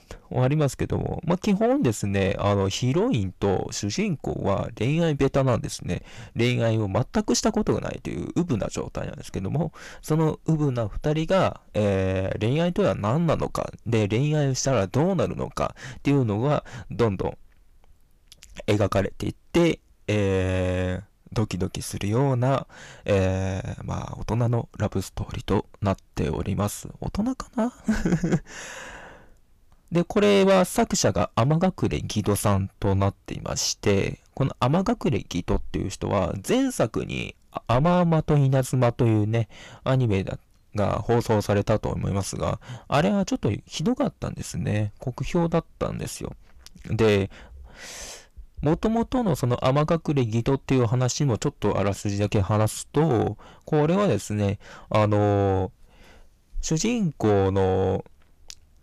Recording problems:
distortion; slight; 10 dB below the speech

